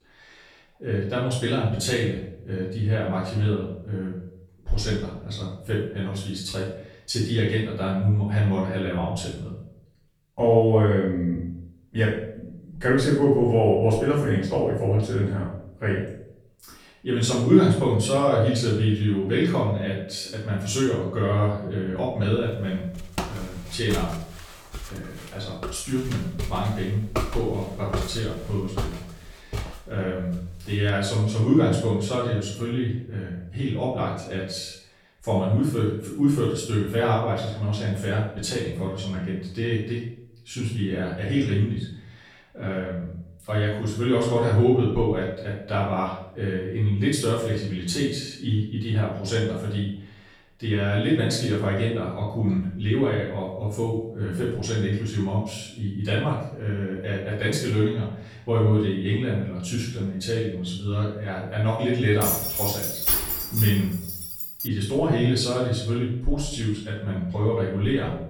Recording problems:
off-mic speech; far
room echo; noticeable; dies away in 0.6 s
footsteps; noticeable; from 23 to 31 s; peak 4 dB below the speech
jangling keys; loud; from 1:02 to 1:05; peak 4 dB above the speech

